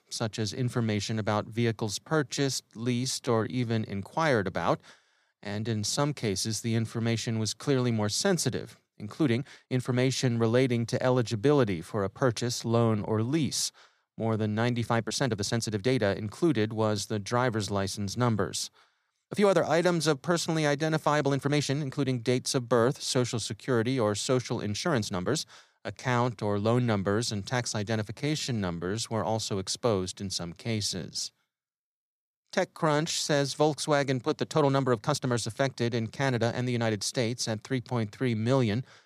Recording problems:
uneven, jittery; strongly; from 2 to 39 s

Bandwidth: 14.5 kHz